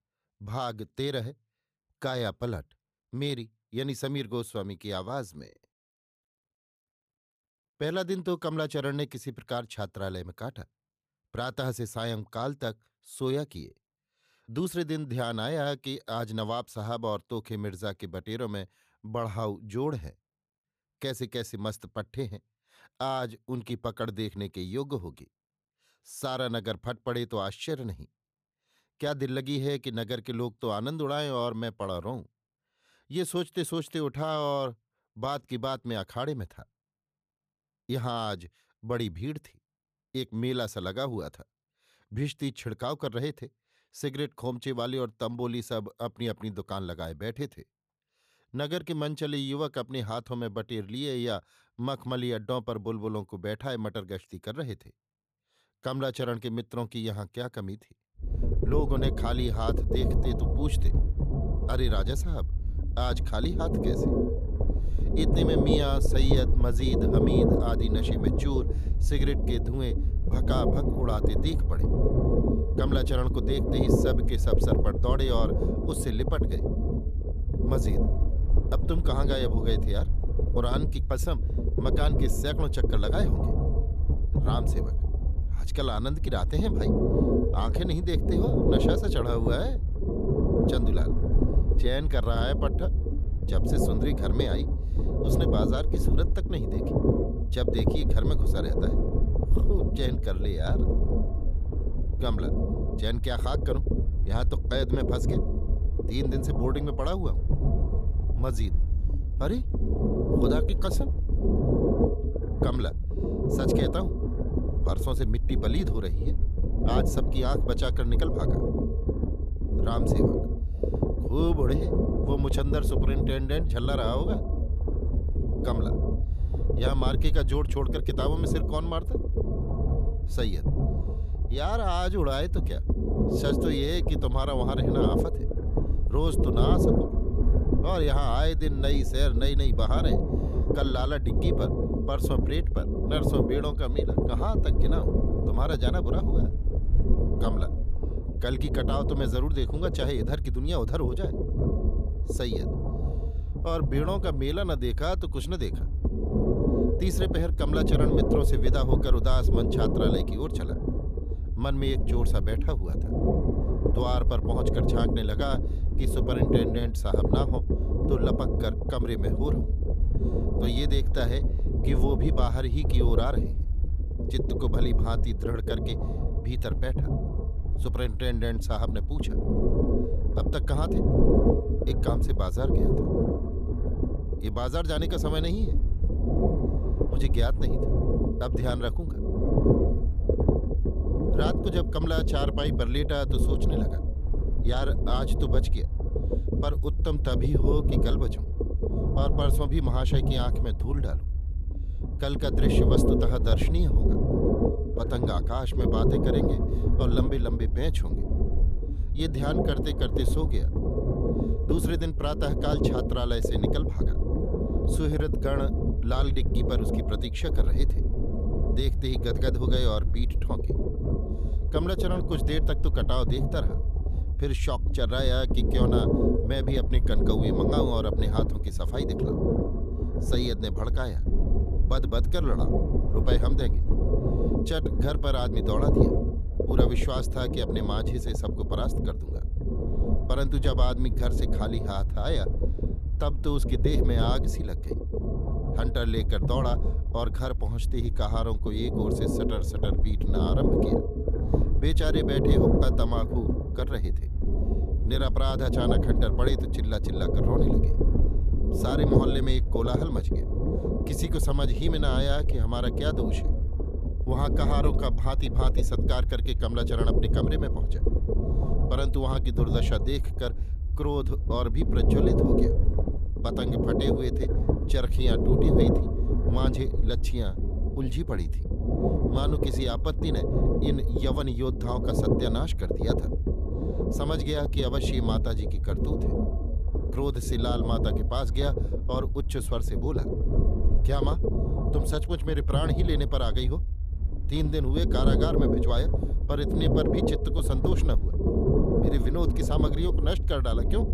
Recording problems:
low rumble; loud; from 58 s on; 1 dB below the speech

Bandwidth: 14.5 kHz